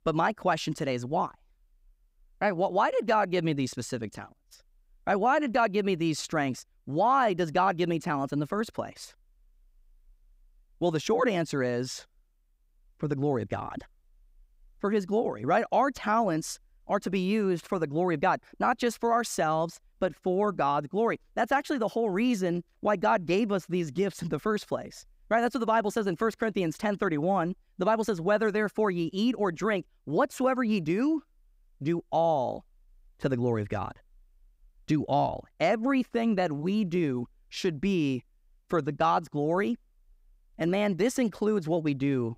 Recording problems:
none

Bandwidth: 15.5 kHz